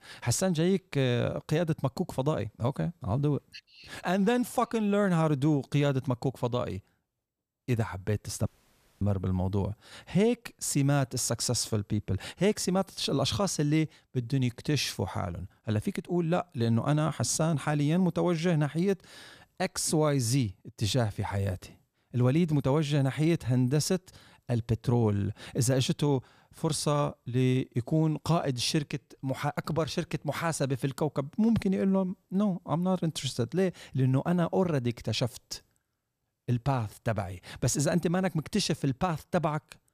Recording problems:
audio cutting out; at 8.5 s for 0.5 s

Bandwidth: 14.5 kHz